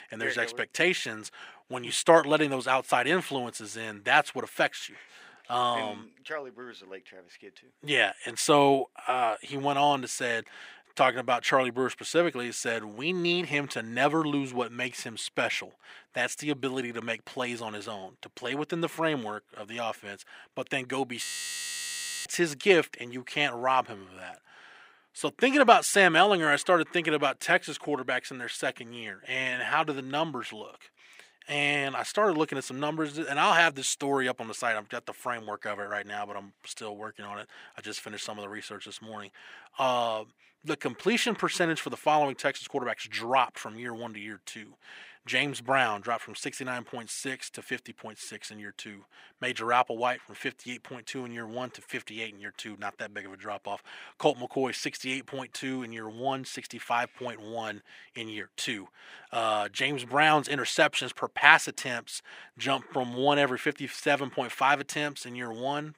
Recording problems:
thin; somewhat; fading below 350 Hz
audio freezing; at 21 s for 1 s

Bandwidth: 15.5 kHz